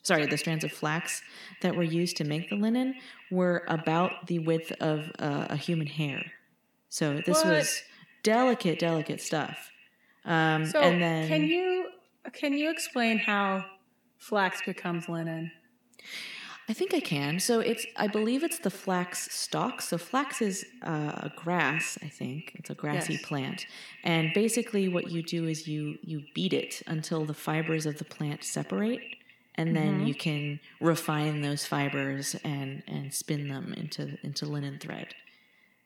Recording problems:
echo of what is said; strong; throughout; 80 ms later, 10 dB below the speech

